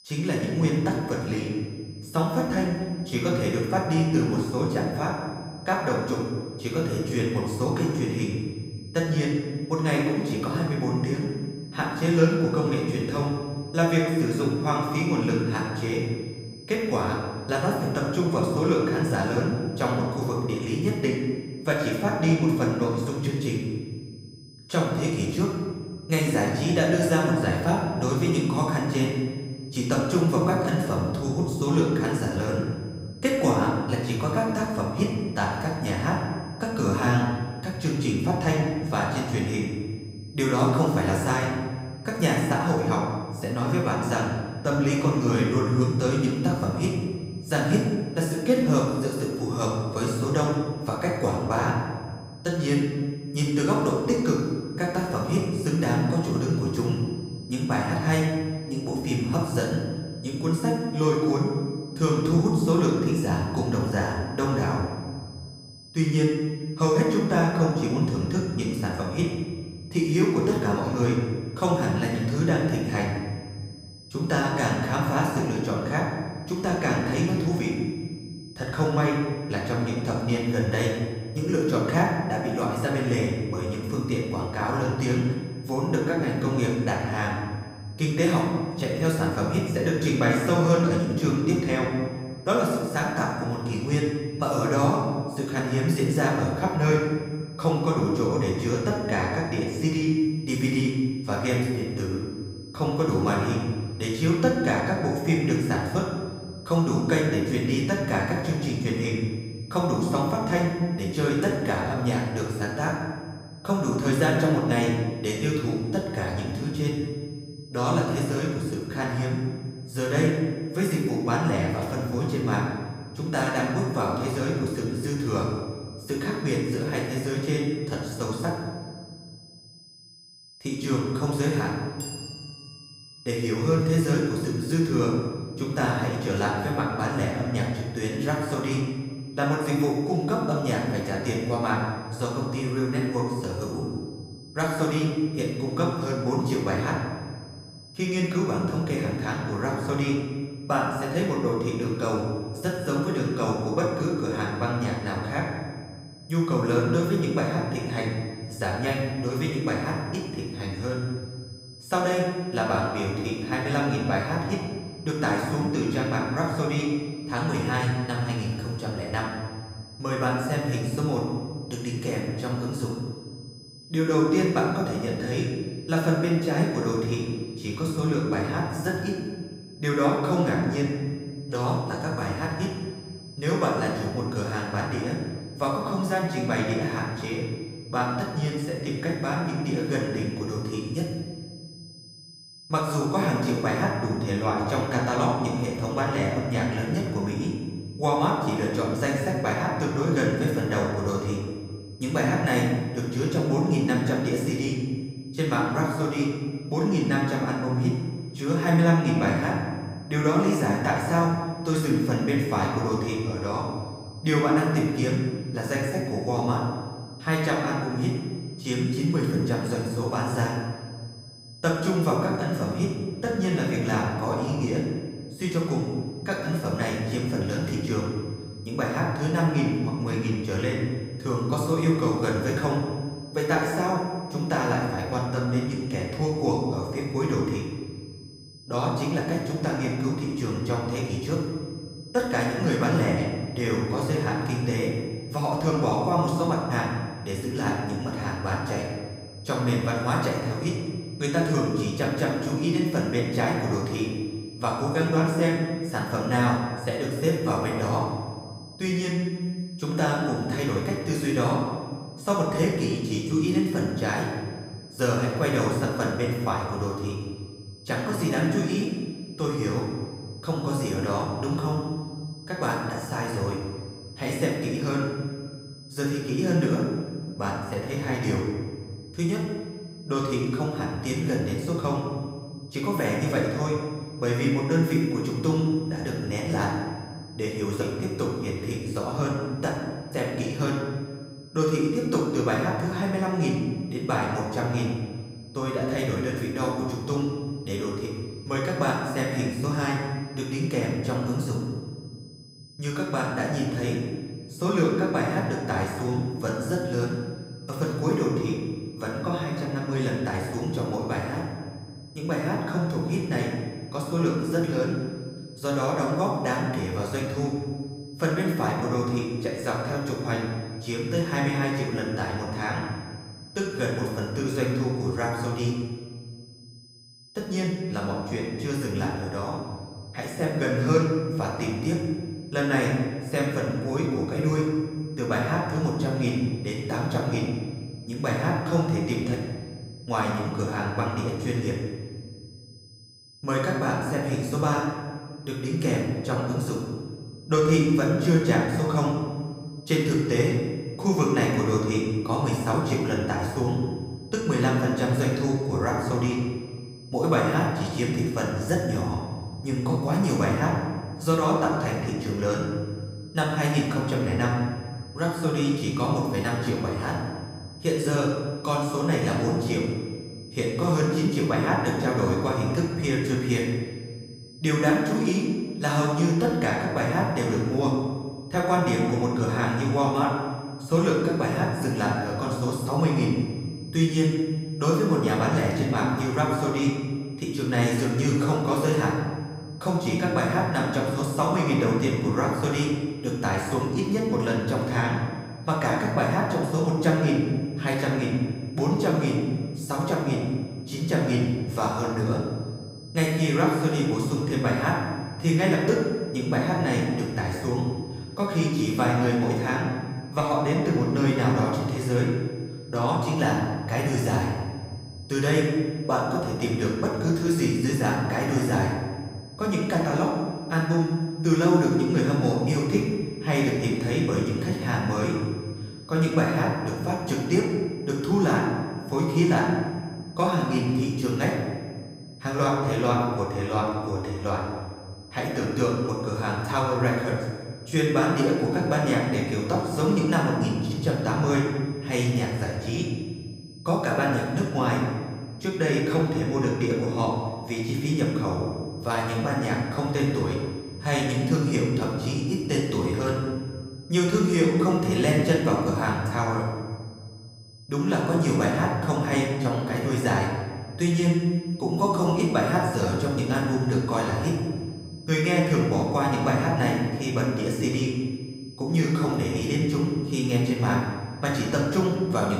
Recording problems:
off-mic speech; far
room echo; noticeable; dies away in 1.4 s
high-pitched whine; faint; throughout; 5 kHz, 20 dB below the speech
abrupt cut into speech; at the end

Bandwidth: 15.5 kHz